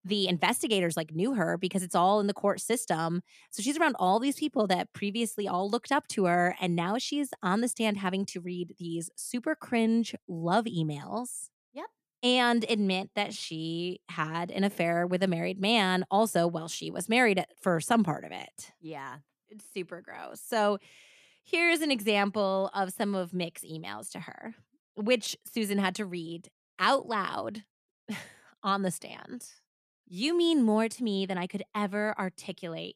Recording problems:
none

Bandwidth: 14.5 kHz